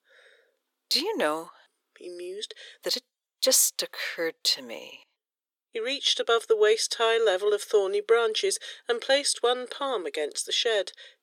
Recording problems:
thin; very; fading below 400 Hz

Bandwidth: 17 kHz